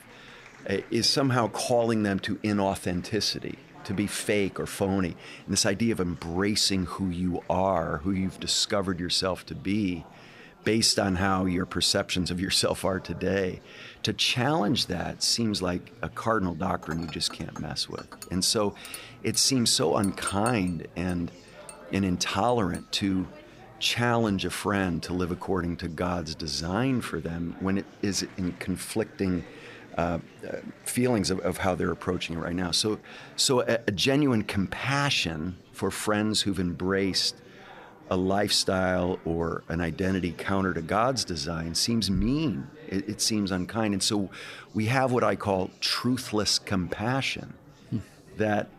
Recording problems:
murmuring crowd; faint; throughout; 25 dB below the speech
clattering dishes; noticeable; from 17 to 23 s; peak 9 dB below the speech

